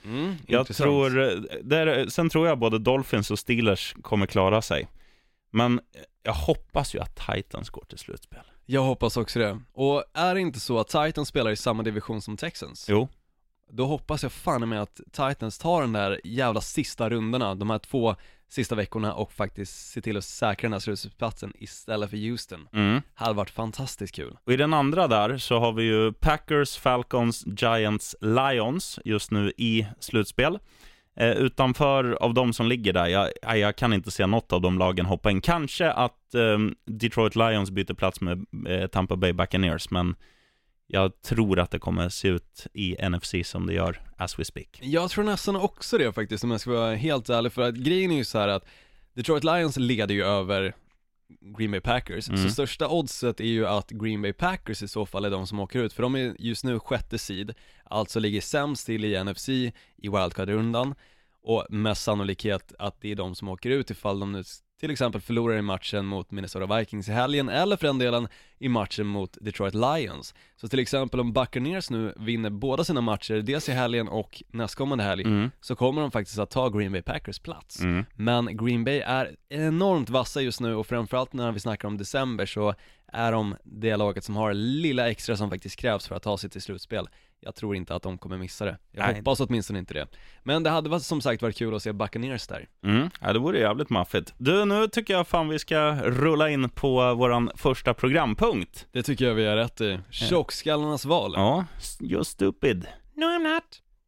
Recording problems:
none

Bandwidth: 16 kHz